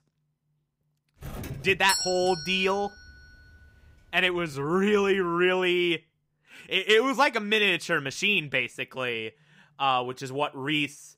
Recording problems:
doorbell; noticeable; from 1 to 2.5 s; peak 2 dB below the speech
uneven, jittery; strongly; from 1.5 to 10 s

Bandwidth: 15.5 kHz